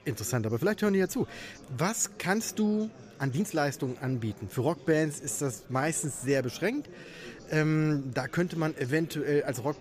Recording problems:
chatter from many people; faint; throughout; 20 dB below the speech
uneven, jittery; strongly; from 1 to 9 s

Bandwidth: 14.5 kHz